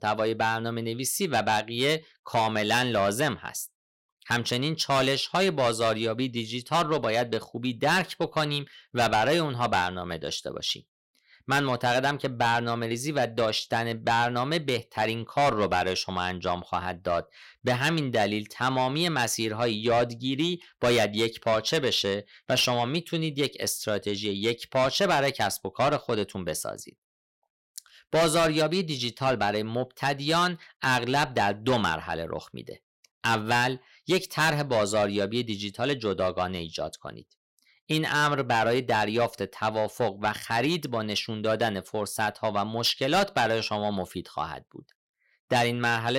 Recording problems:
distortion; heavy; 7 dB below the speech
abrupt cut into speech; at the end

